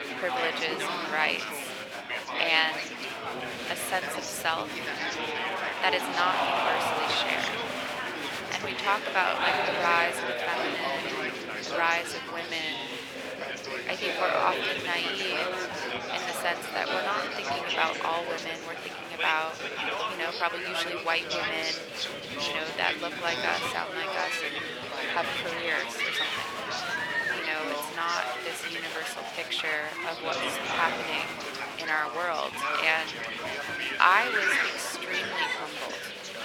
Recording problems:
thin; very; fading below 550 Hz
chatter from many people; loud; throughout; 1 dB below the speech
wind noise on the microphone; occasional gusts; 20 dB below the speech

